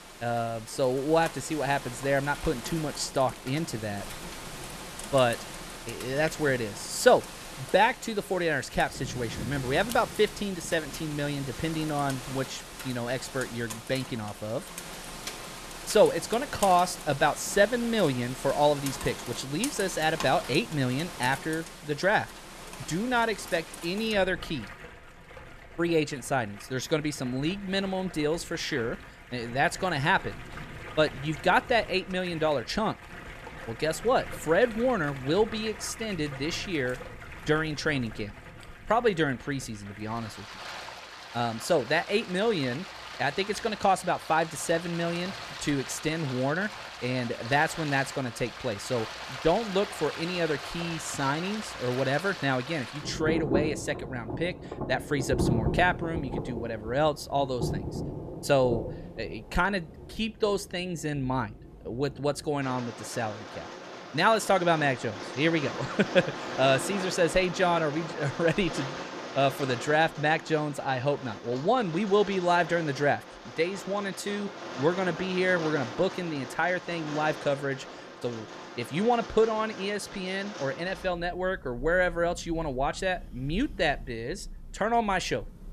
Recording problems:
rain or running water; noticeable; throughout; 10 dB below the speech

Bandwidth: 14 kHz